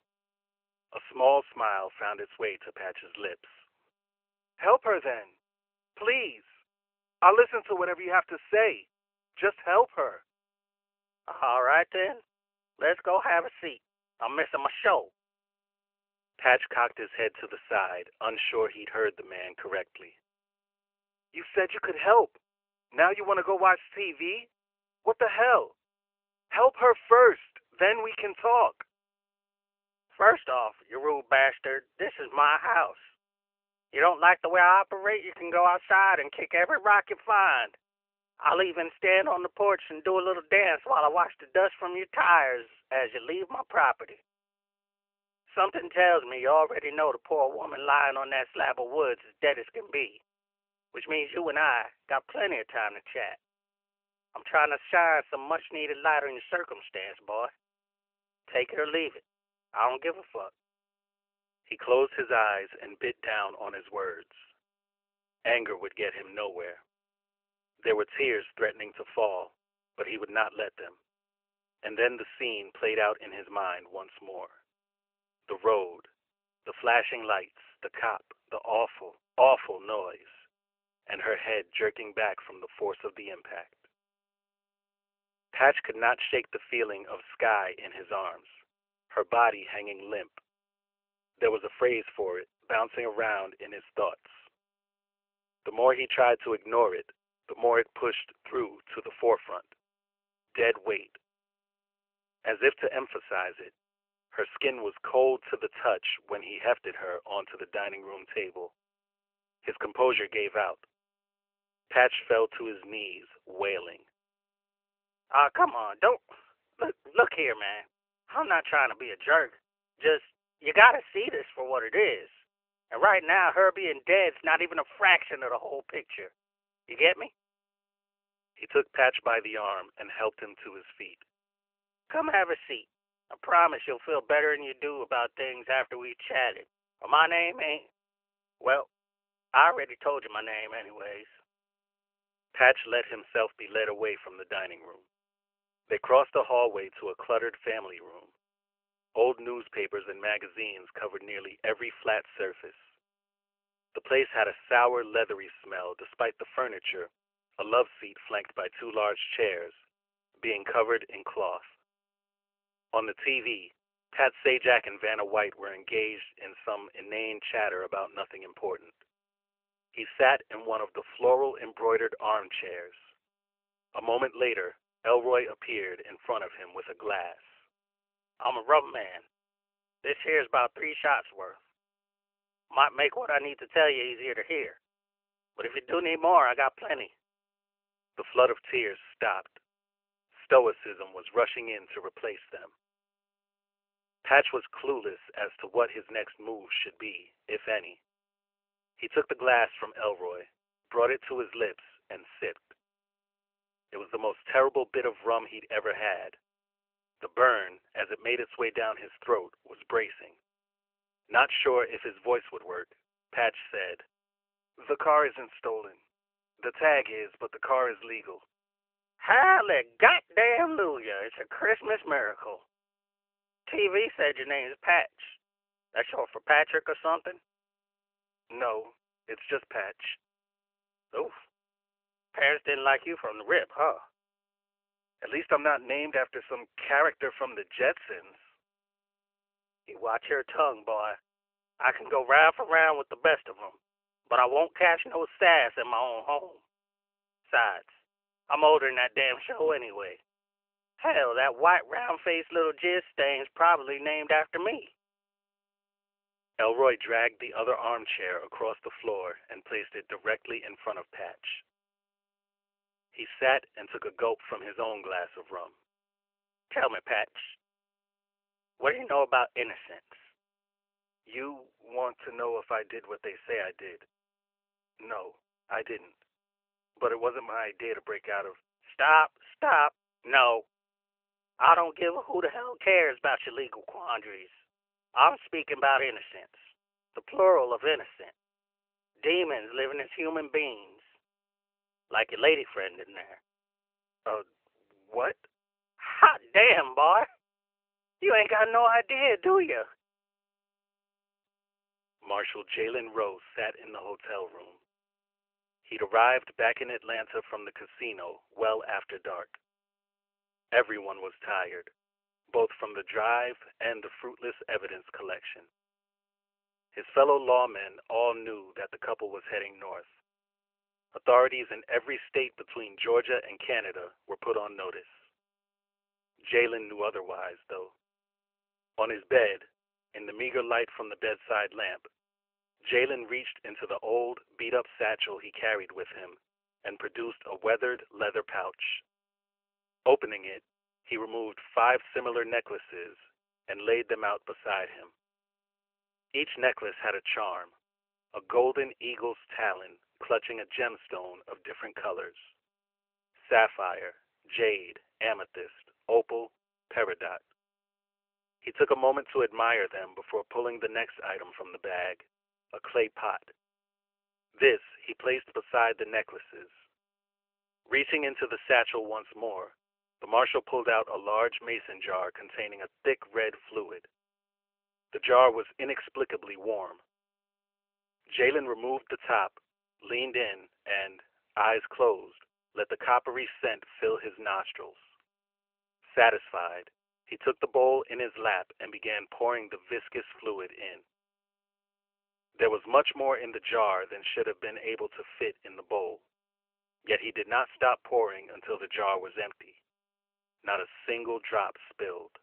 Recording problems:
phone-call audio; nothing above 3 kHz

